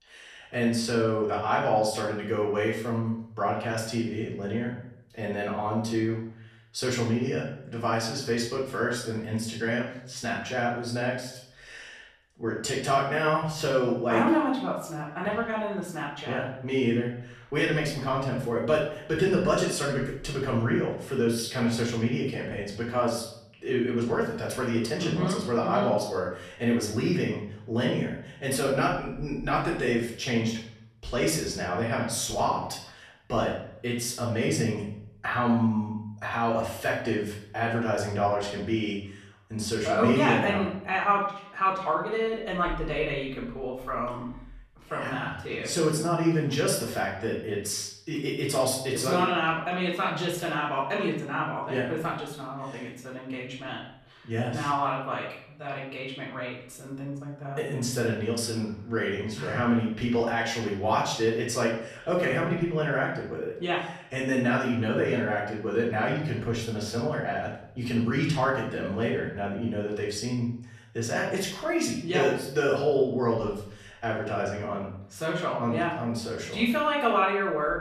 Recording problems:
off-mic speech; far
room echo; noticeable; dies away in 0.6 s

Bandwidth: 14 kHz